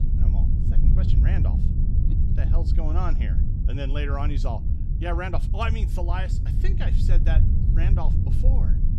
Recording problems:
low rumble; loud; throughout; 5 dB below the speech

